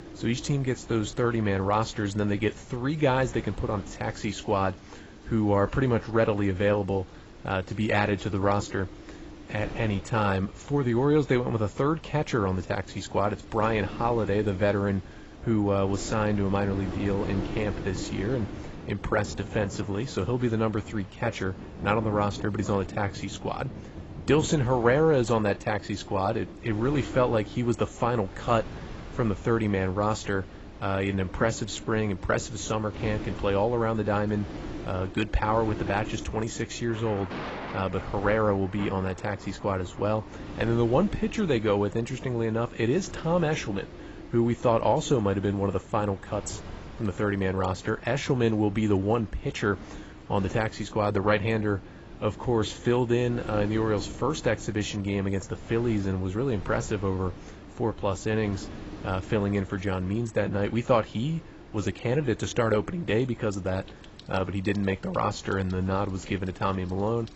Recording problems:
garbled, watery; badly; nothing above 8 kHz
rain or running water; noticeable; throughout; 20 dB below the speech
wind noise on the microphone; occasional gusts; 20 dB below the speech

